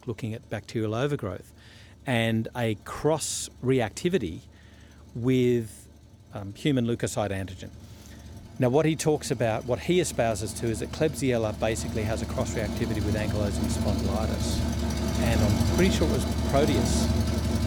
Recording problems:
traffic noise; loud; throughout; 1 dB below the speech

